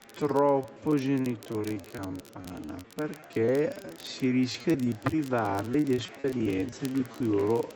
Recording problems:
wrong speed, natural pitch; too slow; 0.6 times normal speed
high frequencies cut off; noticeable; nothing above 8 kHz
murmuring crowd; faint; throughout; 20 dB below the speech
crackle, like an old record; faint; 25 dB below the speech
choppy; very; 15% of the speech affected

